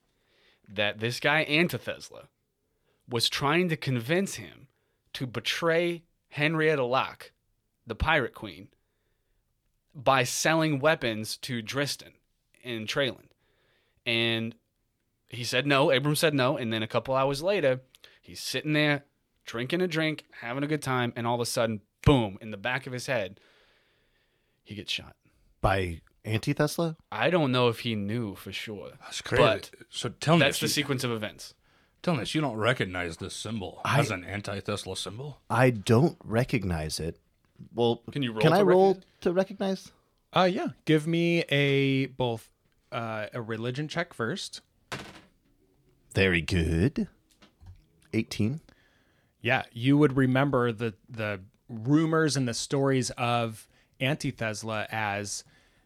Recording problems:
none

